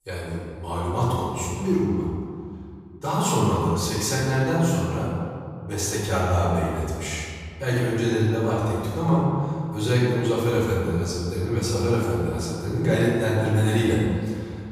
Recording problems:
room echo; strong; dies away in 2 s
off-mic speech; far

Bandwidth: 15 kHz